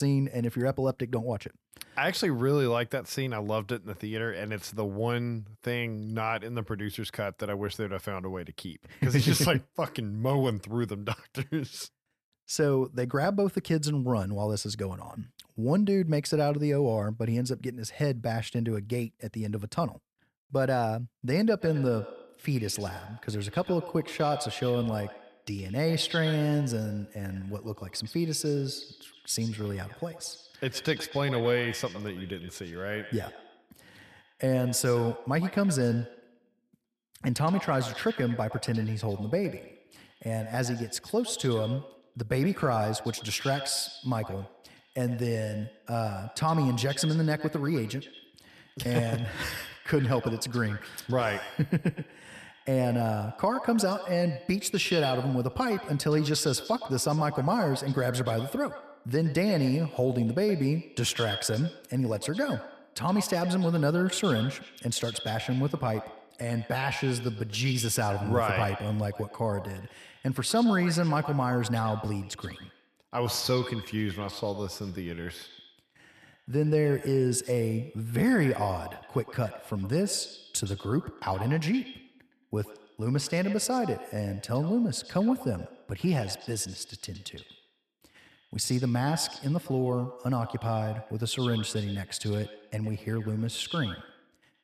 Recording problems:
echo of what is said; noticeable; from 22 s on; 120 ms later, 15 dB below the speech
abrupt cut into speech; at the start

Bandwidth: 14 kHz